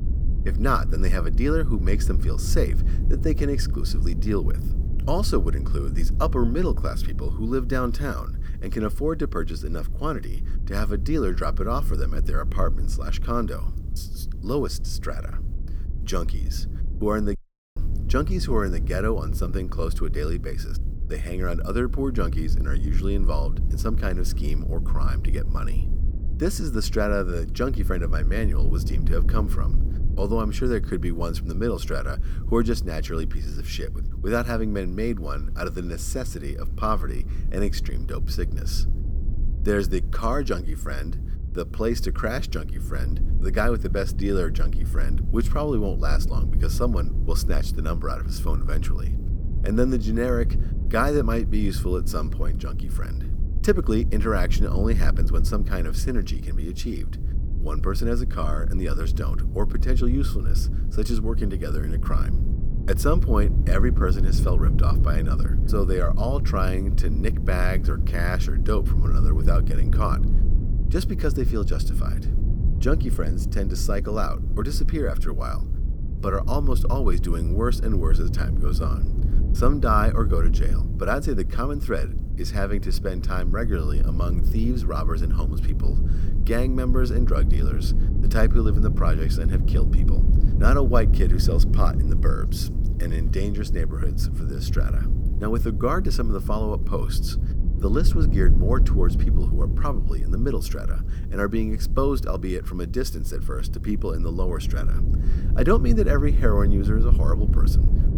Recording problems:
low rumble; noticeable; throughout; 10 dB below the speech
audio cutting out; at 17 s

